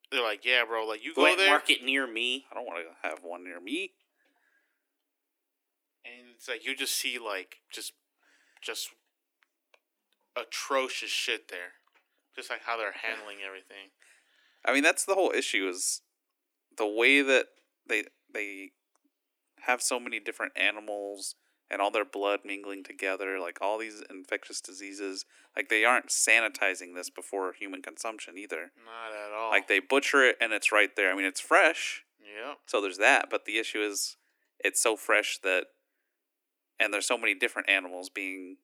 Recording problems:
thin; very; fading below 300 Hz

